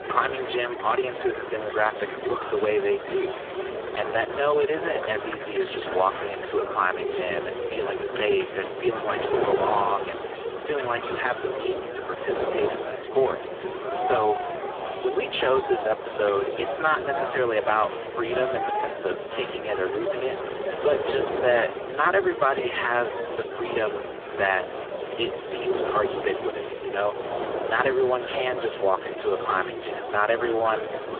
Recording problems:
phone-call audio; poor line; nothing above 3.5 kHz
wind noise on the microphone; heavy; 9 dB below the speech
murmuring crowd; loud; throughout; 7 dB below the speech

